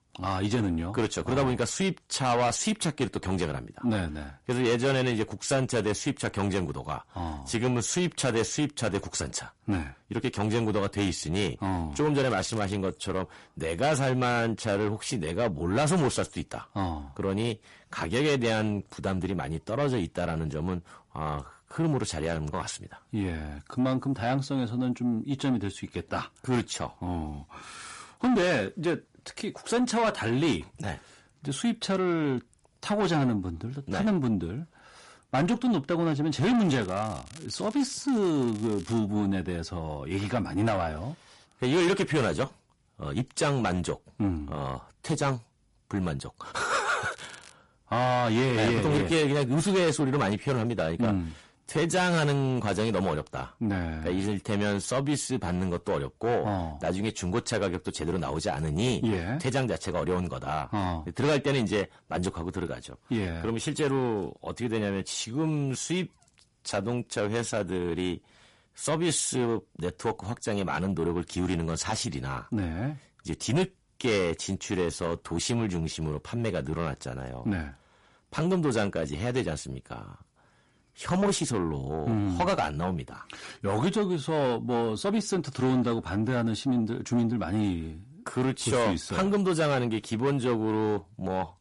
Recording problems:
distortion; heavy; 8 dB below the speech
garbled, watery; slightly; nothing above 11 kHz
crackling; faint; 4 times, first at 12 s; 20 dB below the speech

